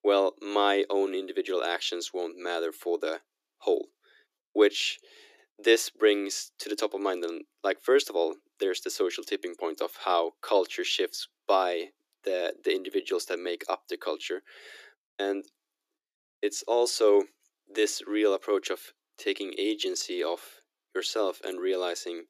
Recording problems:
thin; very; fading below 300 Hz

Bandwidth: 14.5 kHz